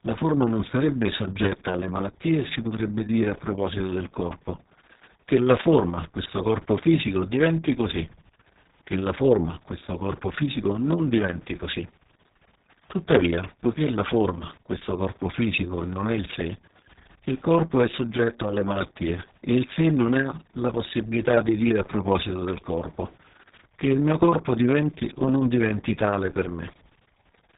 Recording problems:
garbled, watery; badly; nothing above 4 kHz

